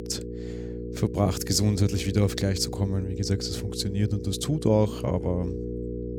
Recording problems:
electrical hum; loud; throughout; 60 Hz, 9 dB below the speech

